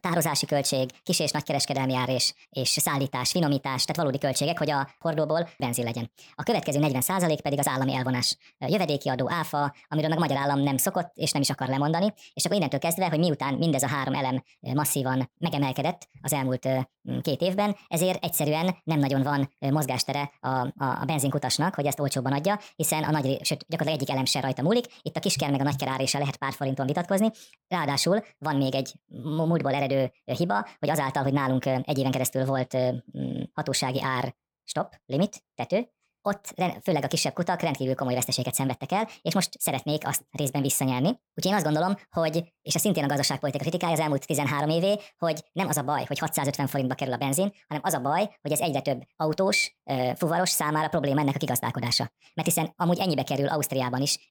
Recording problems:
wrong speed and pitch; too fast and too high; 1.5 times normal speed

